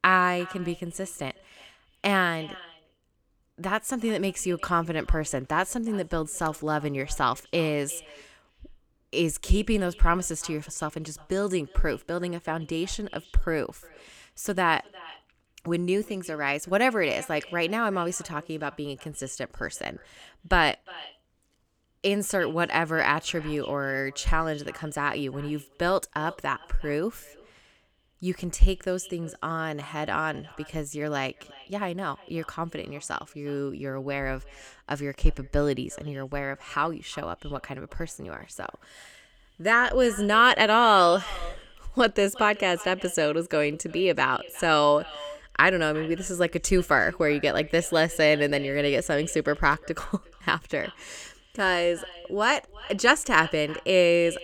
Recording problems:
echo of what is said; faint; throughout; 350 ms later, 20 dB below the speech

